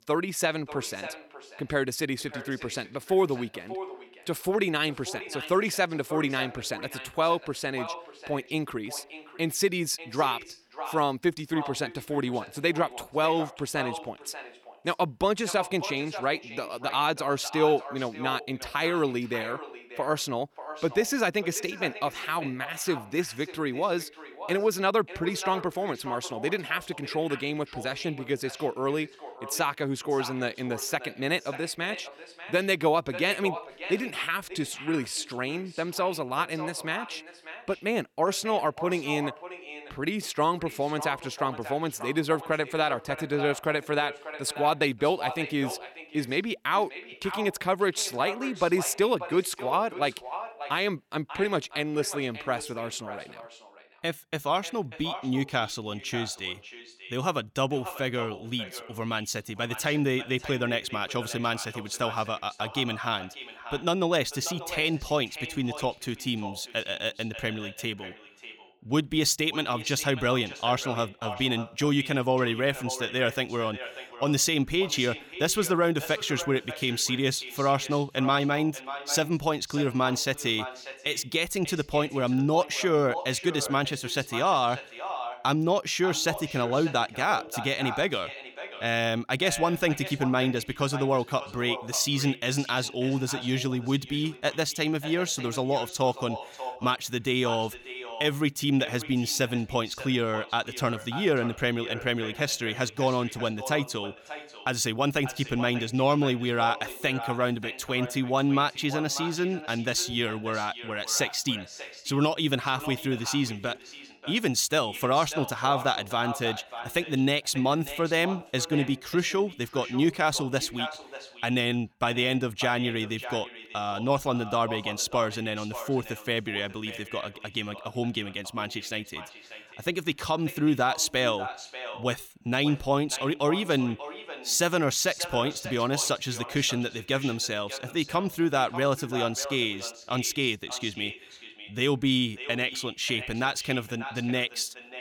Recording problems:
echo of what is said; noticeable; throughout; 590 ms later, 15 dB below the speech

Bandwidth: 18.5 kHz